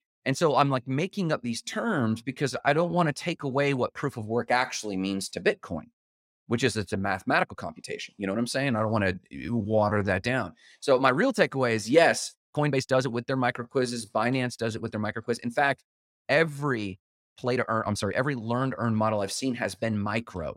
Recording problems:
uneven, jittery; strongly; from 2.5 to 18 s

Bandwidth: 16 kHz